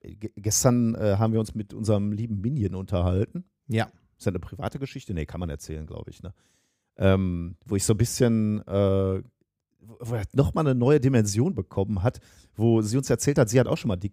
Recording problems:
none

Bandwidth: 15.5 kHz